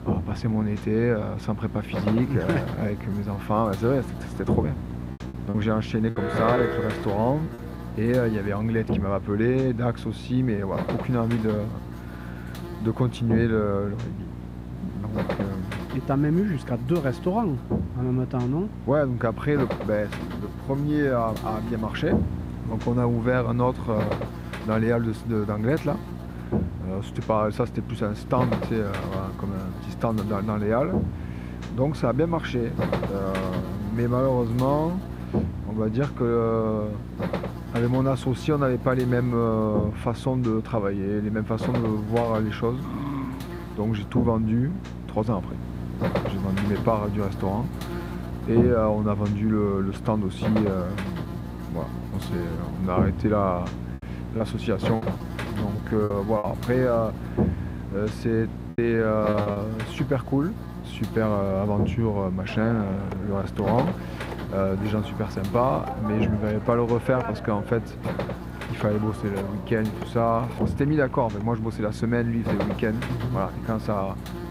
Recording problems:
muffled; slightly; fading above 3 kHz
electrical hum; loud; throughout; 60 Hz, 9 dB below the speech
choppy; very; from 5.5 to 7.5 s, from 54 to 56 s and at 59 s; 9% of the speech affected
alarm; noticeable; from 6 to 7.5 s; peak level with the speech
dog barking; noticeable; at 43 s; peak 5 dB below the speech
phone ringing; noticeable; from 1:02 to 1:11; peak 8 dB below the speech

